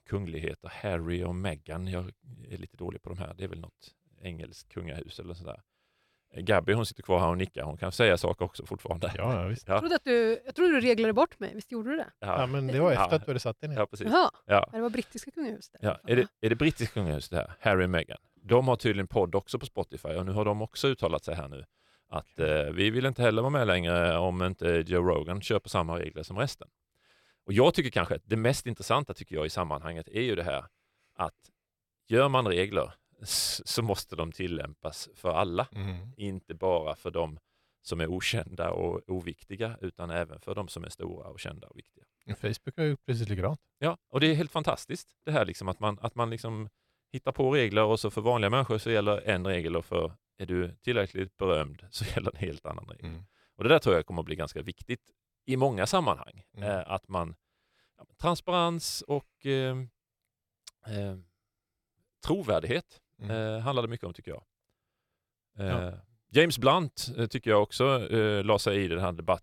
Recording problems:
uneven, jittery; strongly; from 18 to 53 s

